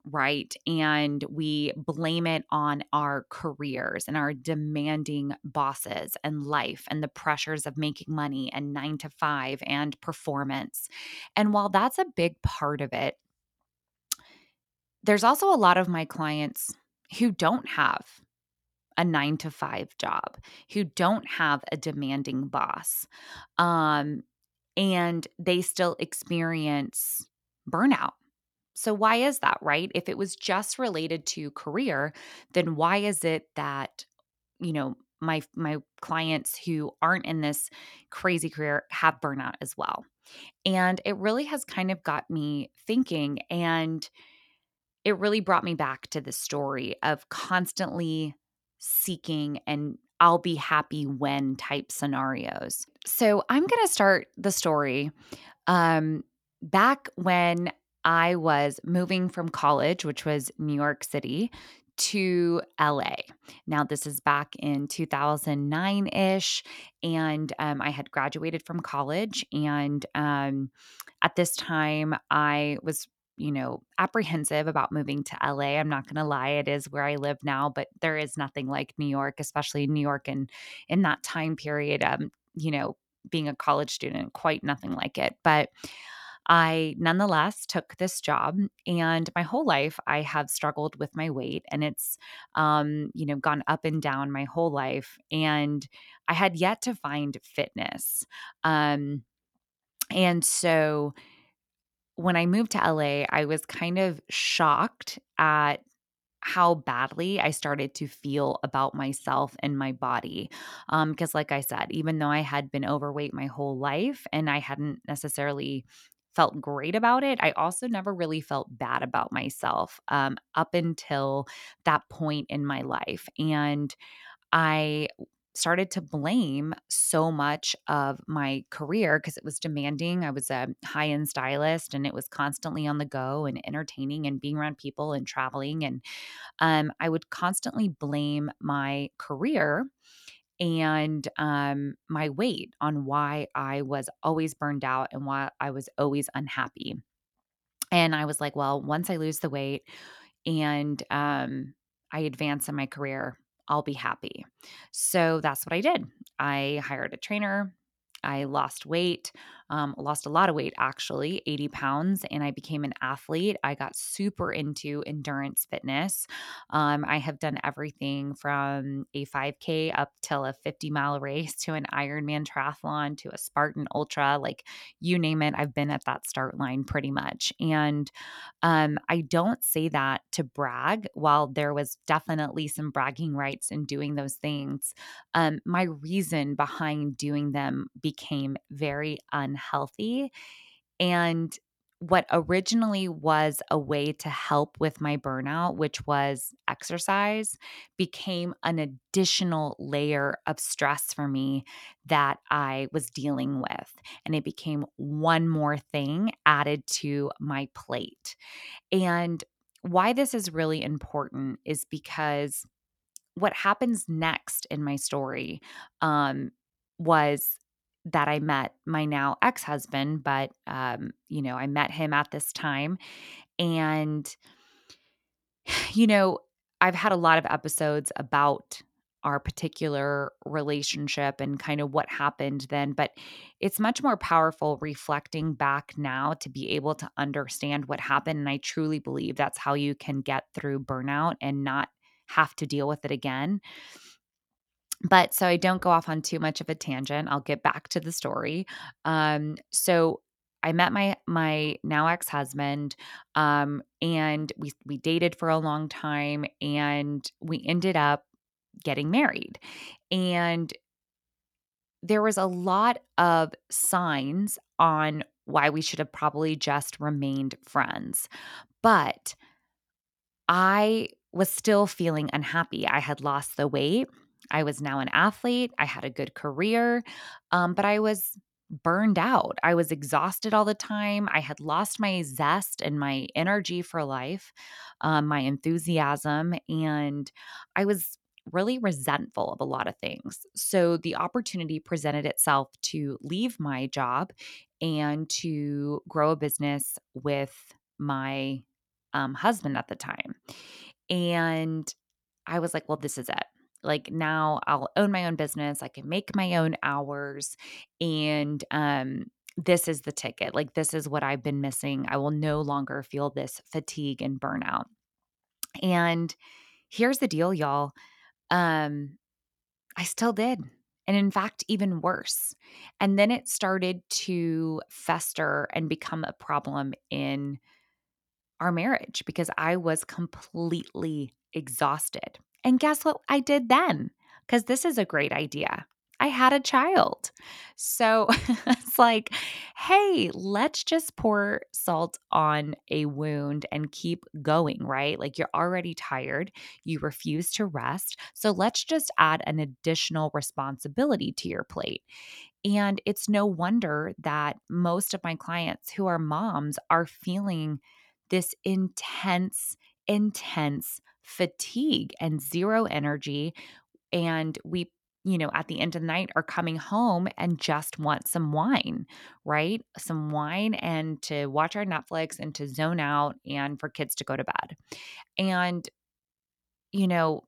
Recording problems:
none

